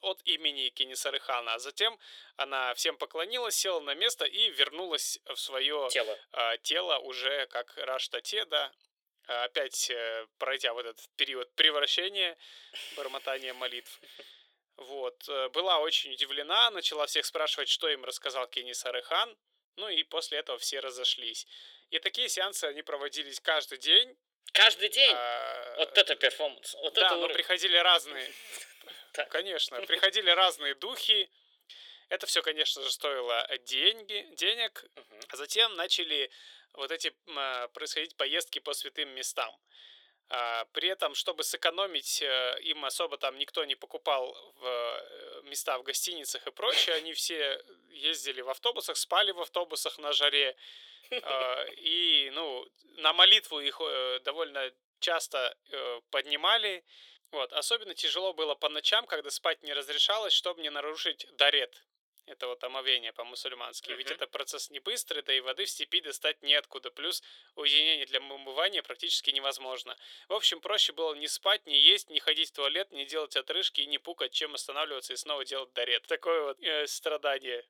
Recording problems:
thin; very; fading below 400 Hz

